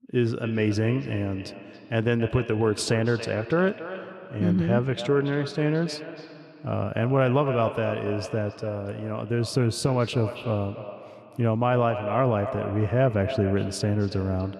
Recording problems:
echo of what is said; strong; throughout; 280 ms later, 10 dB below the speech

